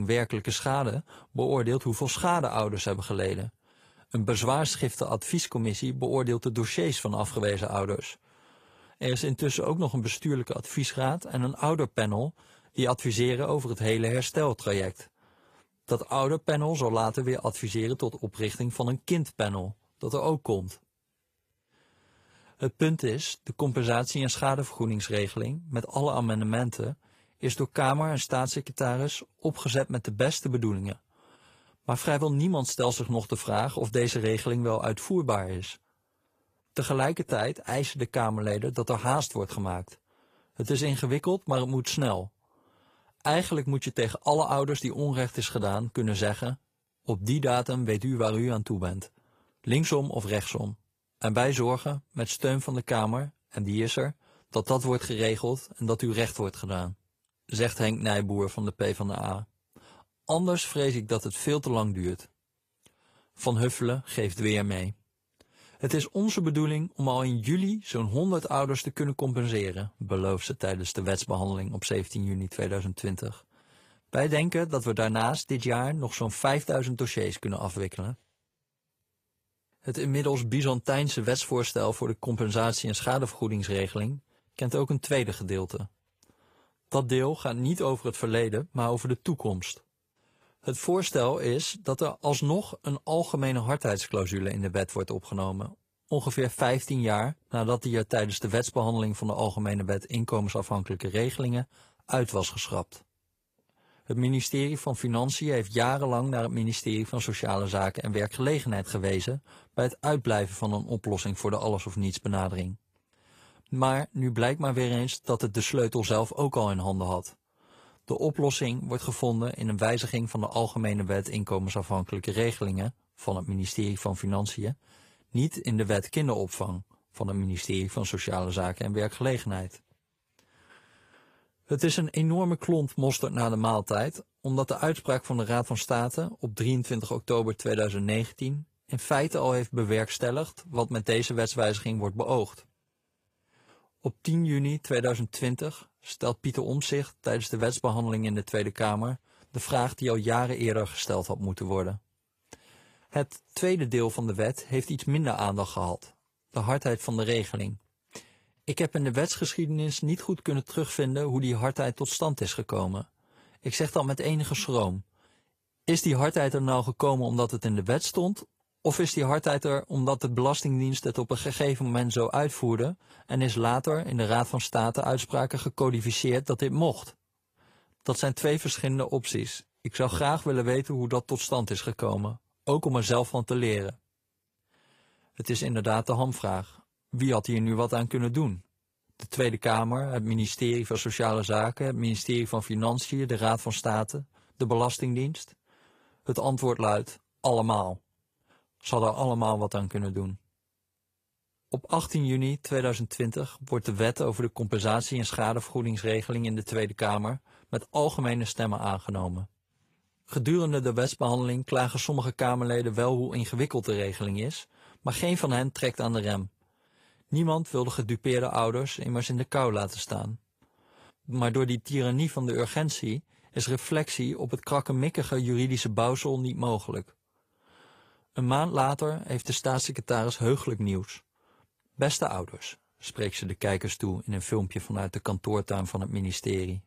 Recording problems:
garbled, watery; slightly; nothing above 14.5 kHz
abrupt cut into speech; at the start

